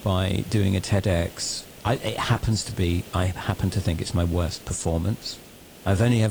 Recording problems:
garbled, watery; slightly
hiss; noticeable; throughout; 20 dB below the speech
abrupt cut into speech; at the end

